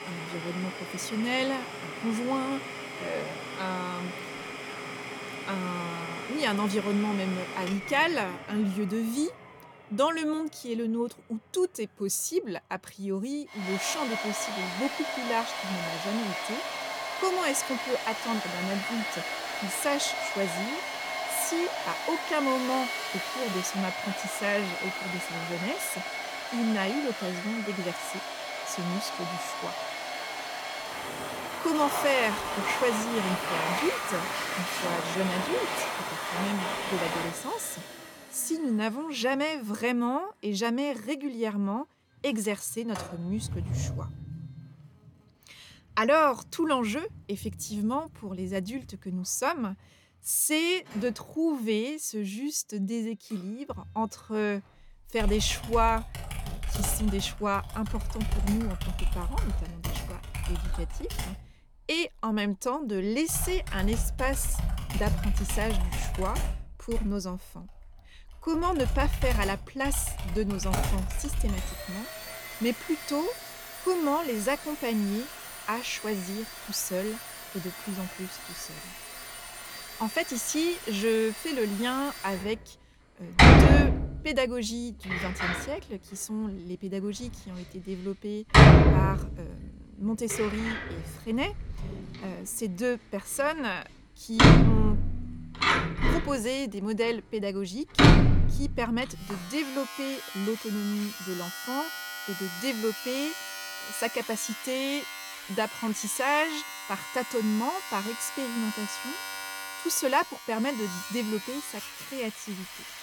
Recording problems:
household noises; very loud; throughout; 1 dB above the speech

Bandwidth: 18 kHz